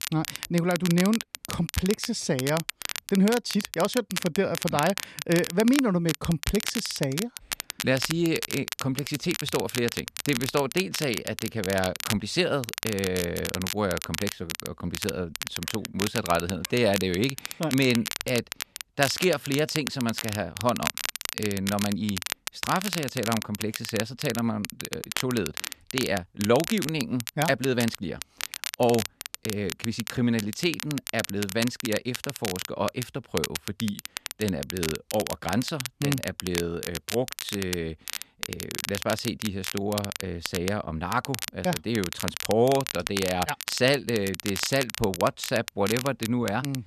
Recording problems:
crackle, like an old record; loud; 6 dB below the speech

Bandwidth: 14 kHz